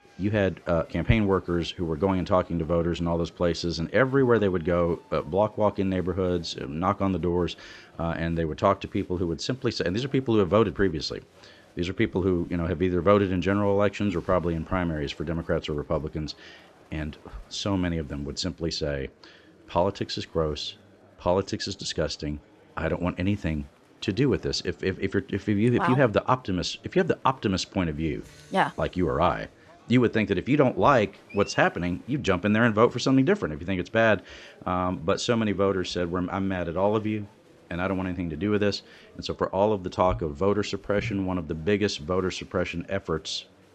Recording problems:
murmuring crowd; faint; throughout; 30 dB below the speech

